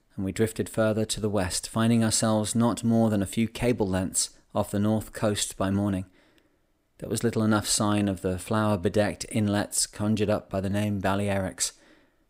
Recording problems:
none

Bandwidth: 15.5 kHz